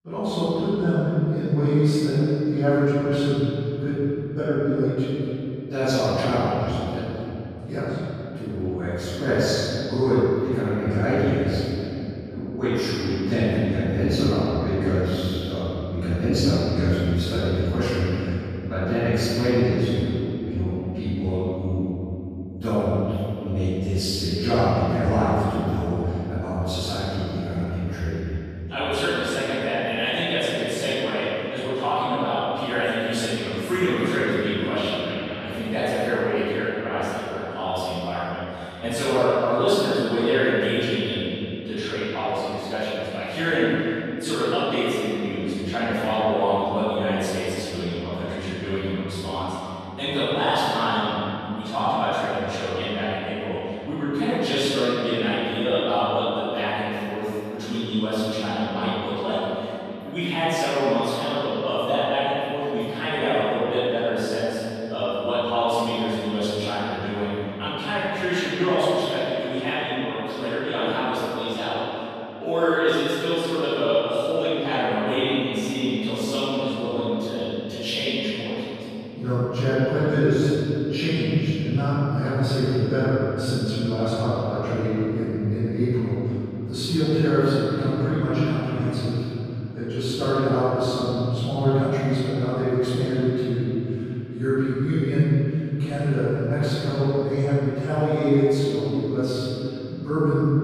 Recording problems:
room echo; strong; dies away in 3 s
off-mic speech; far

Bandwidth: 14.5 kHz